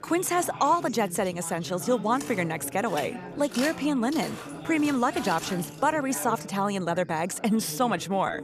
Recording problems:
background chatter; noticeable; throughout; 3 voices, 15 dB below the speech
footsteps; noticeable; from 2 to 6 s; peak 8 dB below the speech

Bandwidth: 14.5 kHz